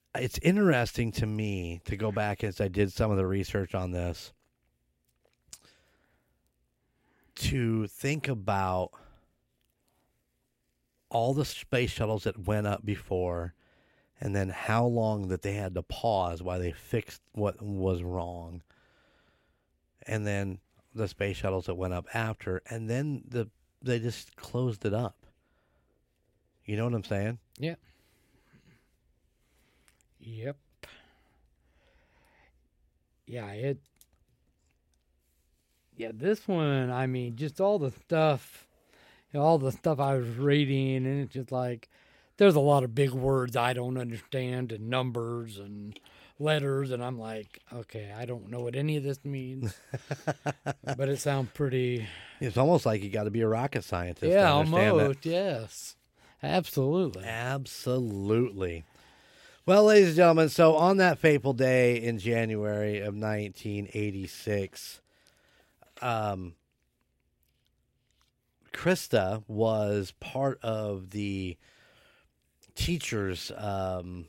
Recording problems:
none

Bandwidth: 16 kHz